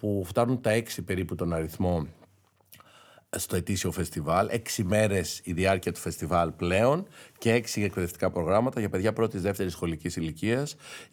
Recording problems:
none

